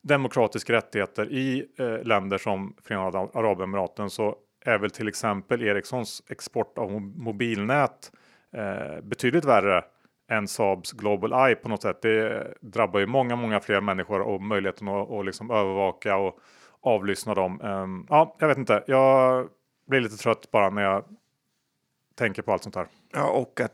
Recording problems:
none

